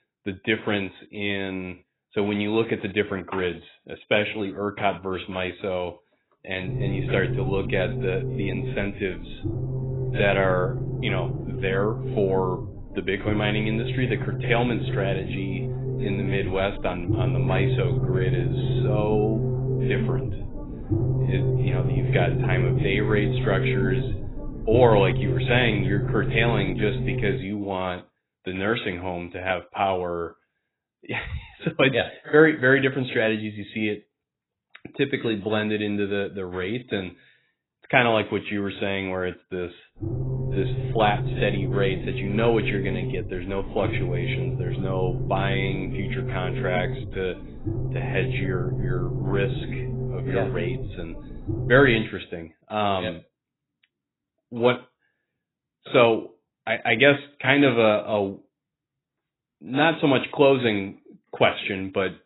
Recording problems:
garbled, watery; badly; nothing above 4 kHz
low rumble; loud; from 6.5 to 27 s and from 40 to 52 s; 10 dB below the speech

